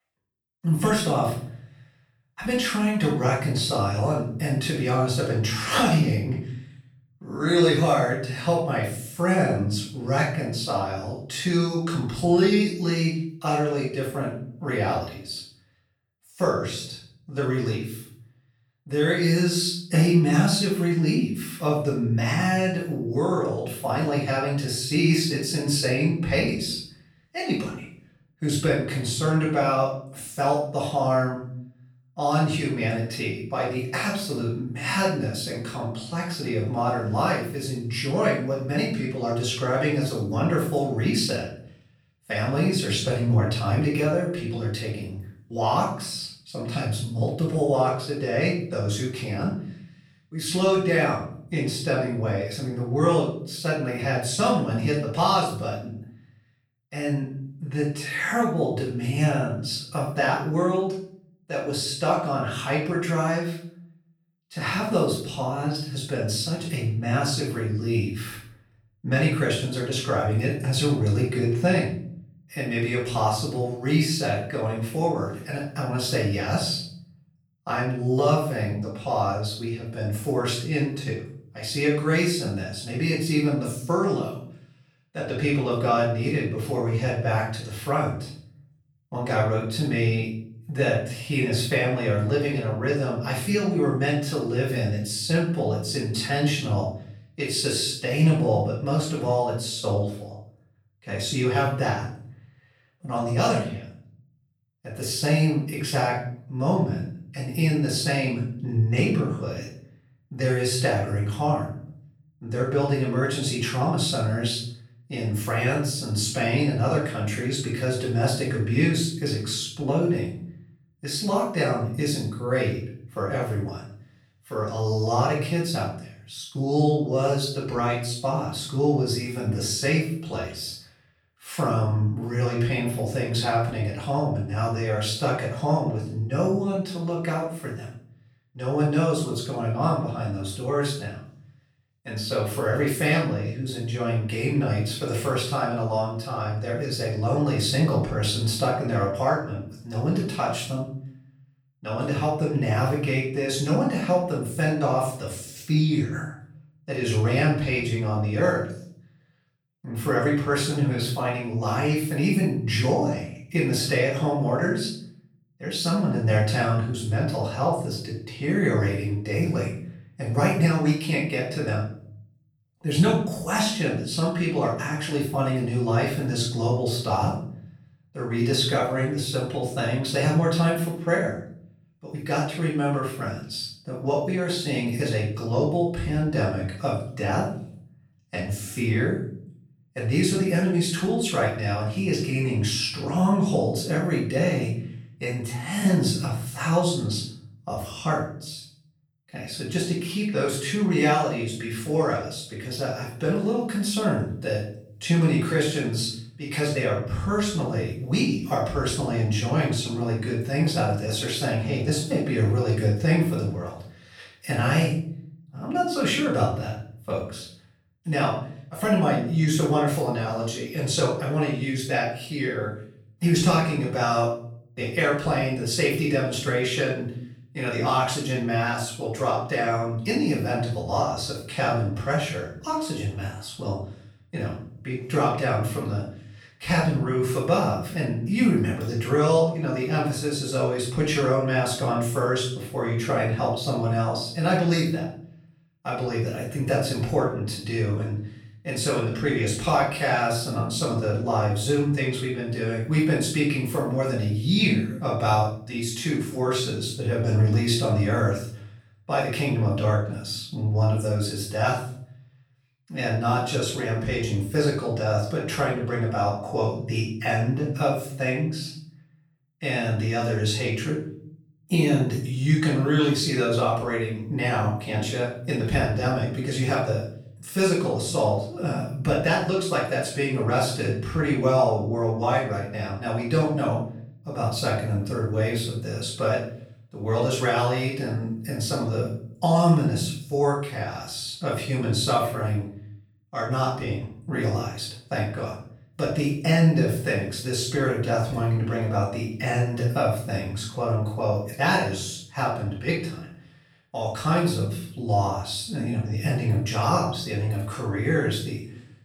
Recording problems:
off-mic speech; far
room echo; noticeable; dies away in 0.6 s

